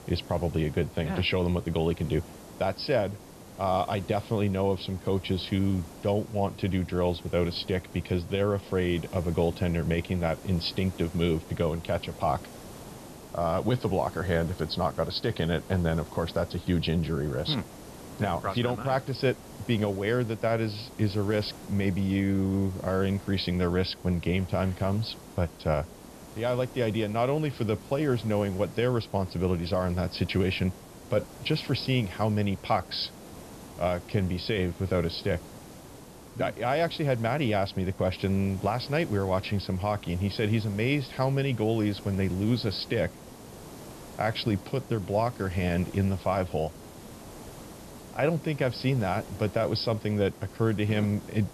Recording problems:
high frequencies cut off; noticeable; nothing above 5 kHz
hiss; noticeable; throughout; 15 dB below the speech

